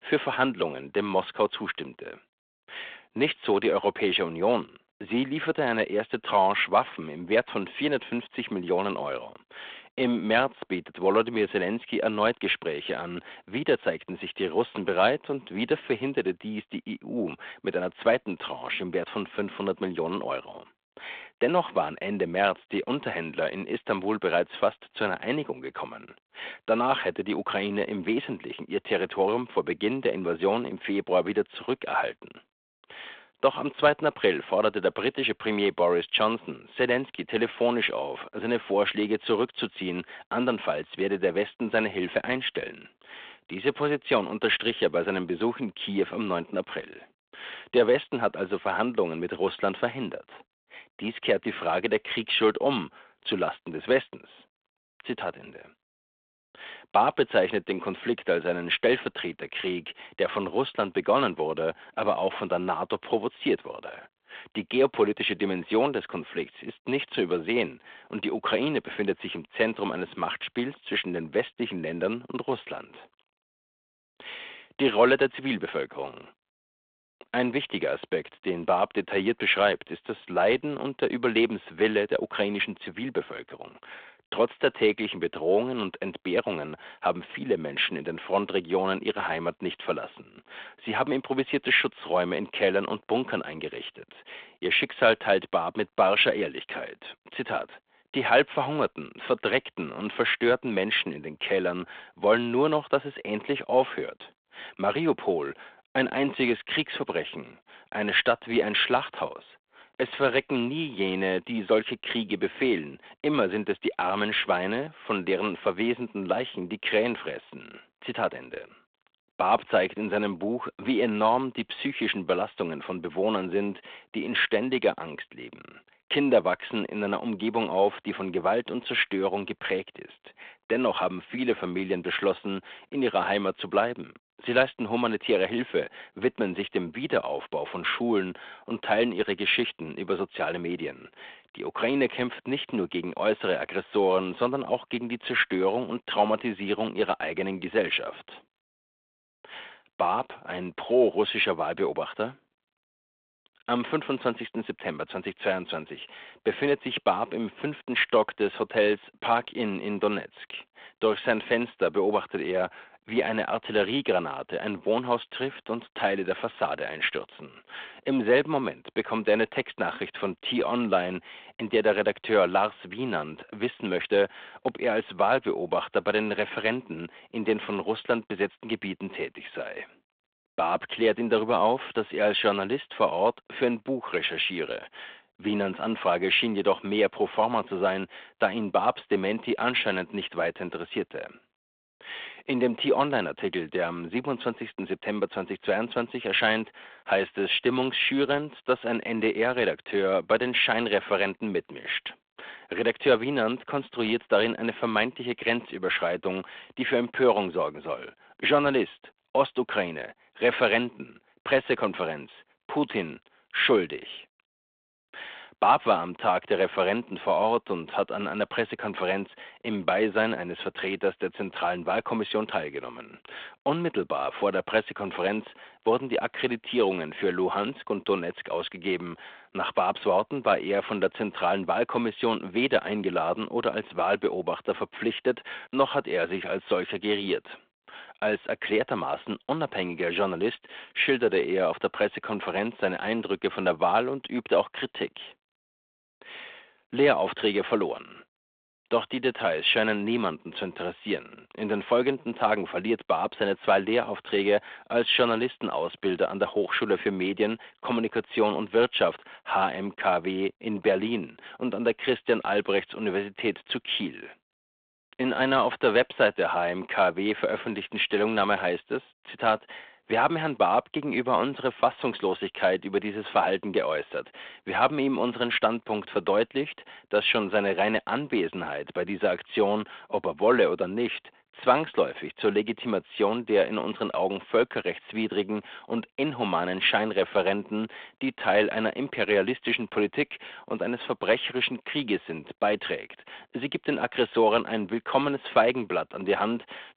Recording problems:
phone-call audio

